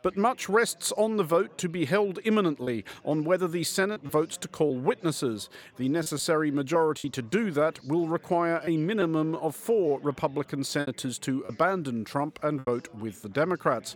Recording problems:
background chatter; faint; throughout; 4 voices, 30 dB below the speech
choppy; occasionally; 4% of the speech affected

